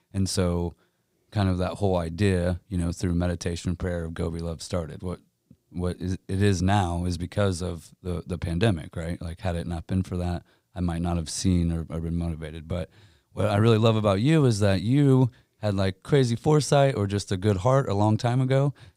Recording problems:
none

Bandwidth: 15.5 kHz